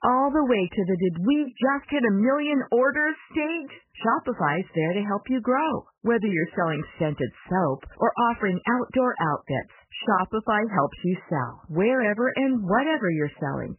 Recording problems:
garbled, watery; badly; nothing above 3 kHz

